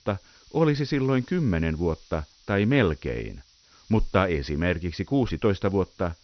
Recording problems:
high frequencies cut off; noticeable; nothing above 6 kHz
hiss; faint; throughout; 30 dB below the speech

